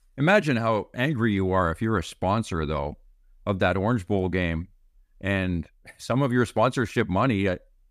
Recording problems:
none

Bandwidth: 15 kHz